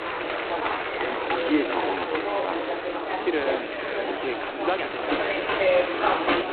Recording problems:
phone-call audio; poor line; nothing above 4 kHz
echo of what is said; strong; throughout; 510 ms later, 7 dB below the speech
crowd noise; very loud; throughout; 1 dB above the speech
murmuring crowd; very loud; throughout; 4 dB above the speech
uneven, jittery; strongly; from 0.5 to 6 s

